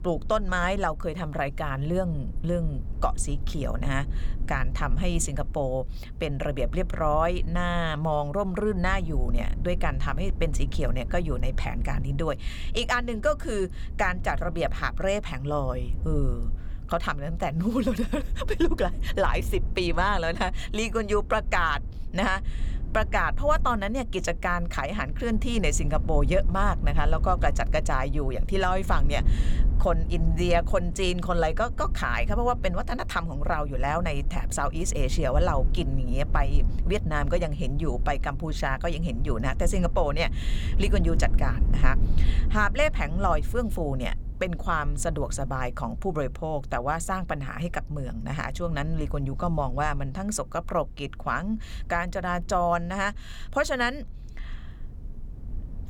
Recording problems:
low rumble; faint; throughout; 20 dB below the speech

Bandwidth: 18 kHz